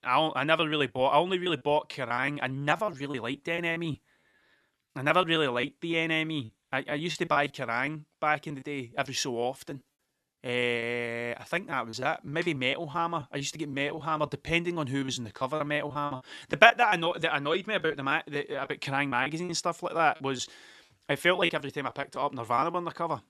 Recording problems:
choppy; very; 12% of the speech affected

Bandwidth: 13.5 kHz